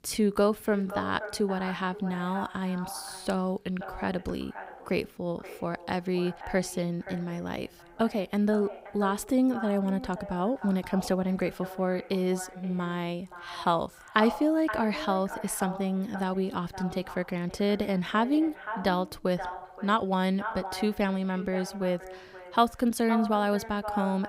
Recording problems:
echo of what is said; noticeable; throughout; 520 ms later, 10 dB below the speech

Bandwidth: 15.5 kHz